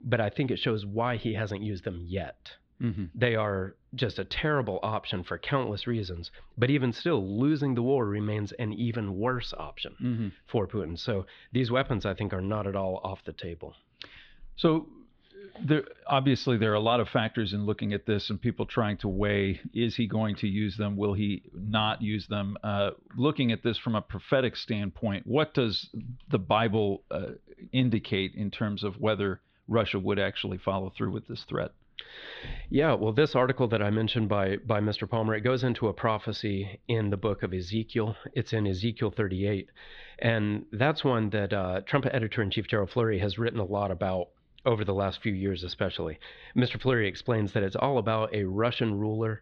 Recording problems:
muffled; slightly; fading above 4 kHz

